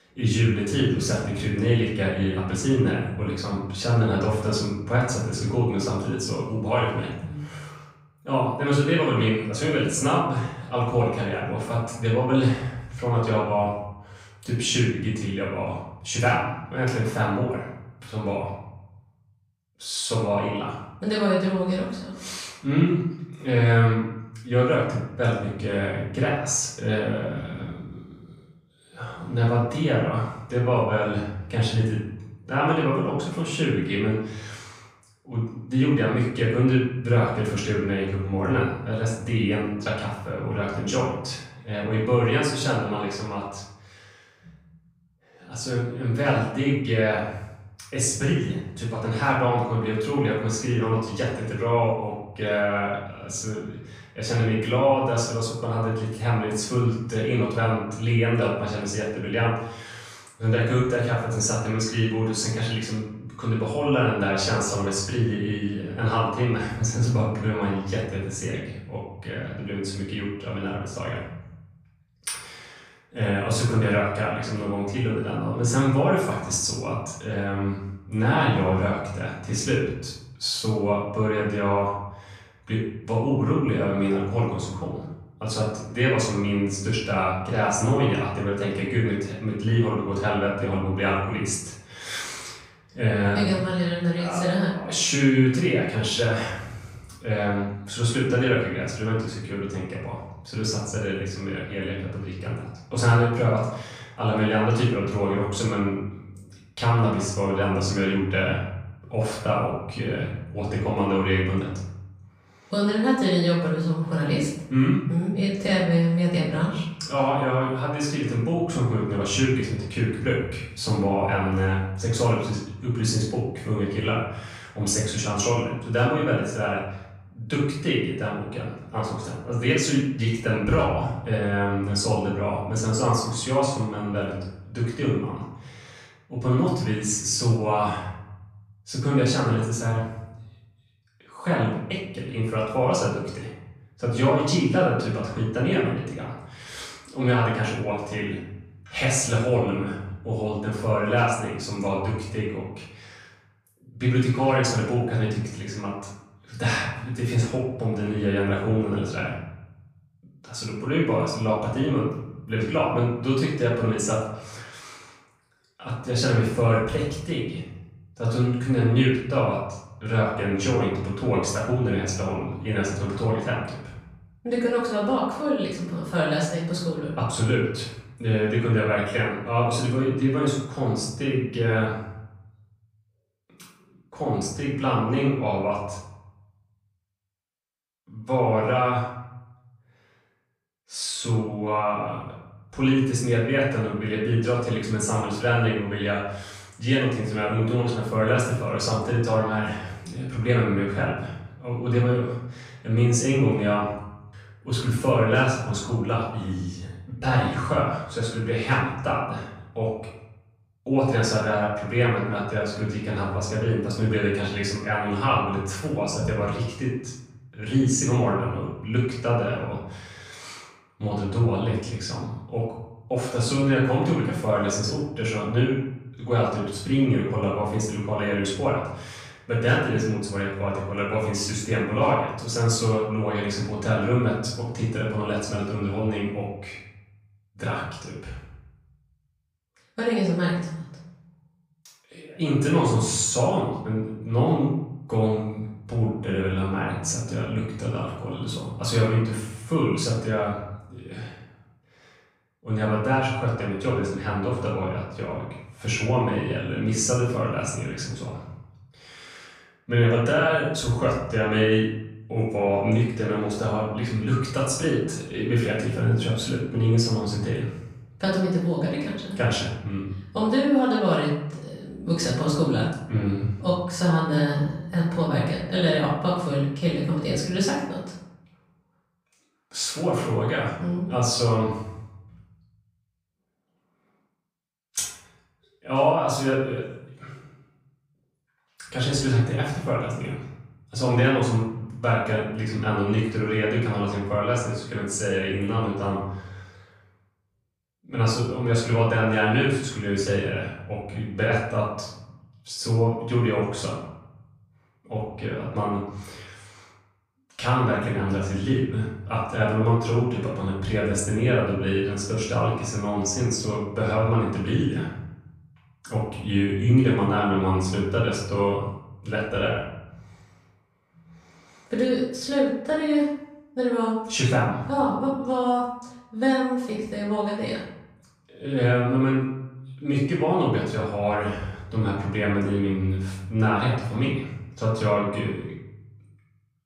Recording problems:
off-mic speech; far
room echo; noticeable; dies away in 0.8 s

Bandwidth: 15.5 kHz